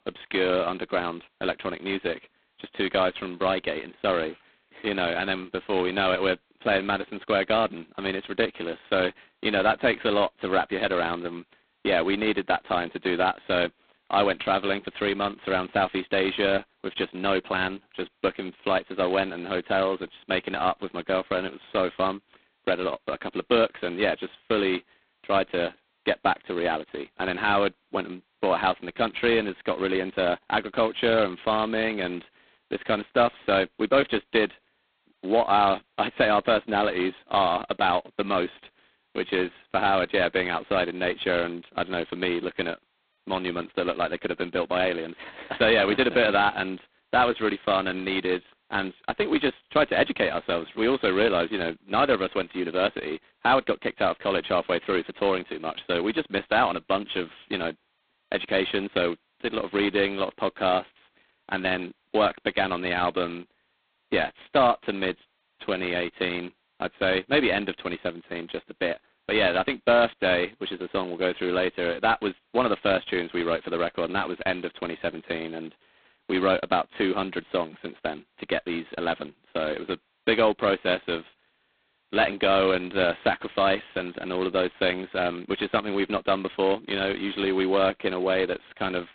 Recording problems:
phone-call audio; poor line; nothing above 4 kHz

